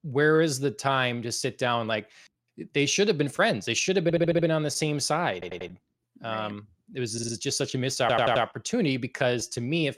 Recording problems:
audio stuttering; 4 times, first at 4 s

